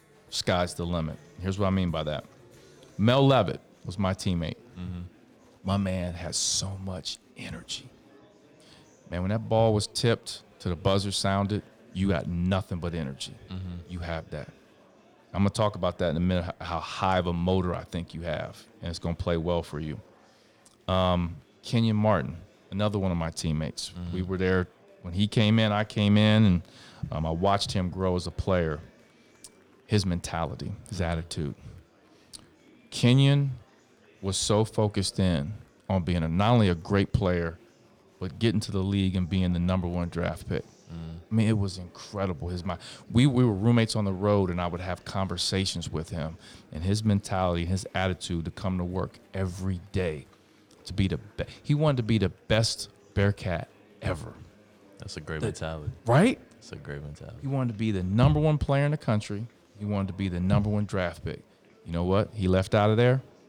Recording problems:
murmuring crowd; faint; throughout; 30 dB below the speech

